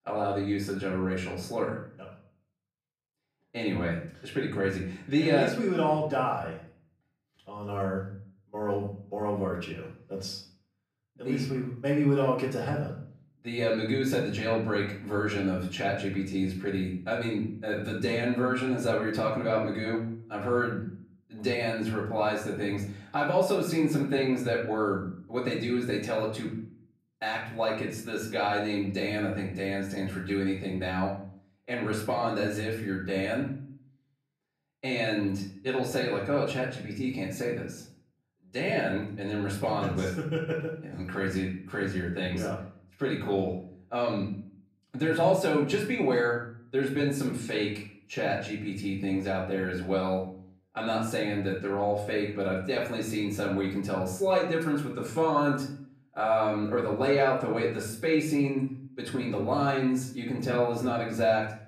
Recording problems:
off-mic speech; far
room echo; noticeable; dies away in 0.5 s

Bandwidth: 14.5 kHz